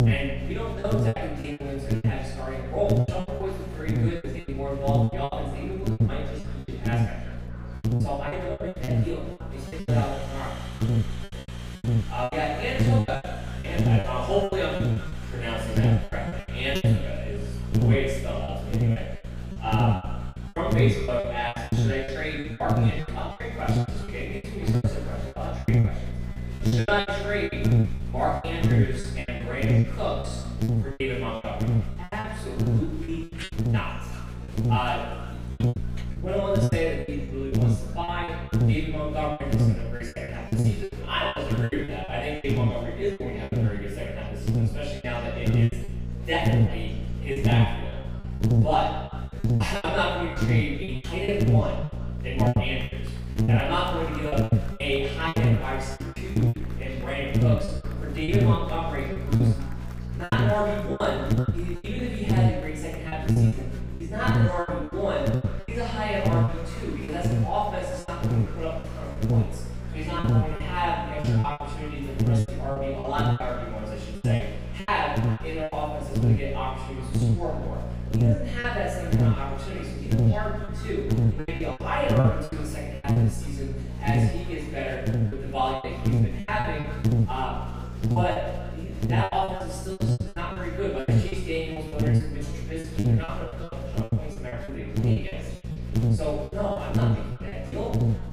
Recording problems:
room echo; strong; dies away in 0.7 s
off-mic speech; far
echo of what is said; noticeable; throughout; 190 ms later, 15 dB below the speech
electrical hum; loud; throughout; 60 Hz, 6 dB below the speech
murmuring crowd; noticeable; throughout; 15 dB below the speech
choppy; very; 13% of the speech affected

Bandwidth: 15.5 kHz